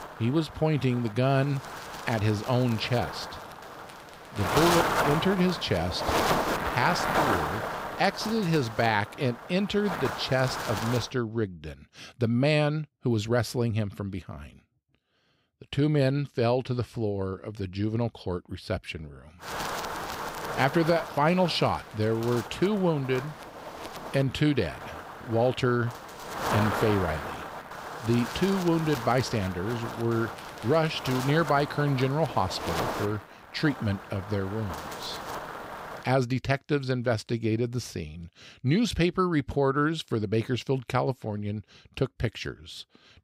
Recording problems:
wind noise on the microphone; heavy; until 11 s and from 19 to 36 s; 3 dB below the speech

